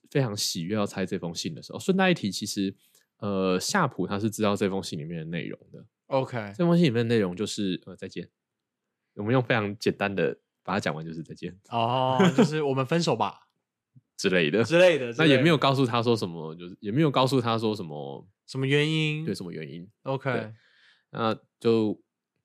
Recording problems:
none

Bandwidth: 14 kHz